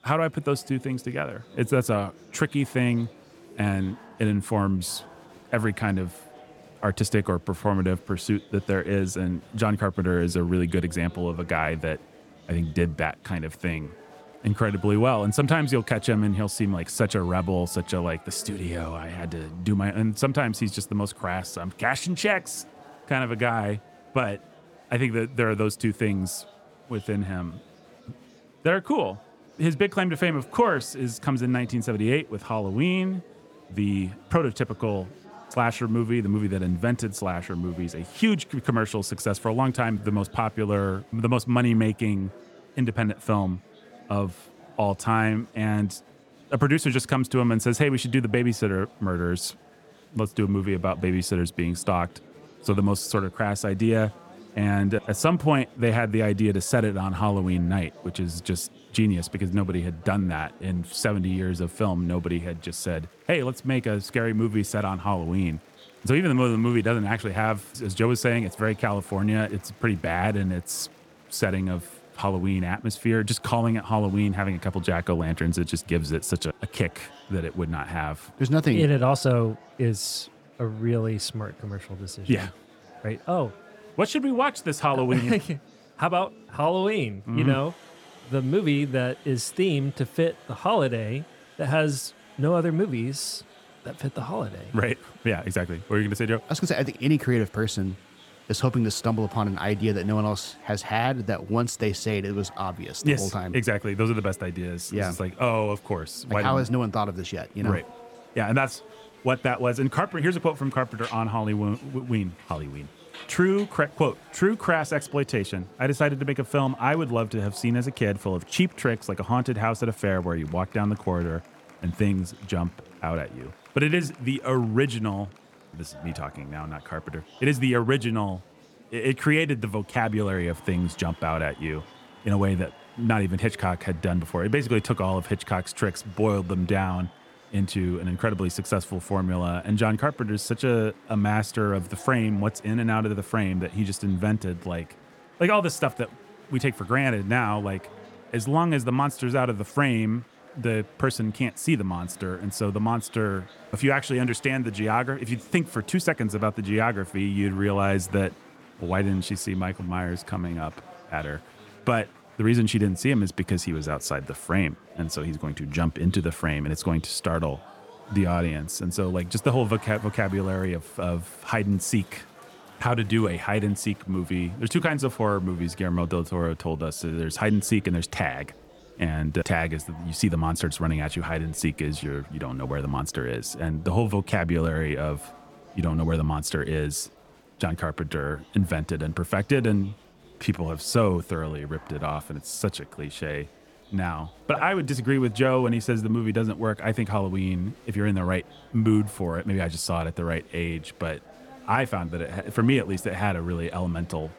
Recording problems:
murmuring crowd; faint; throughout; 25 dB below the speech

